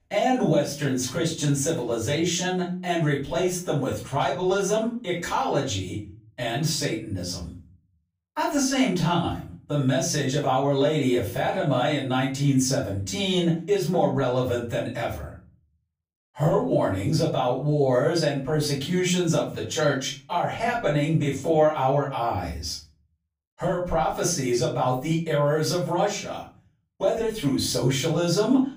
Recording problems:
off-mic speech; far
room echo; slight; dies away in 0.5 s

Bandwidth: 15.5 kHz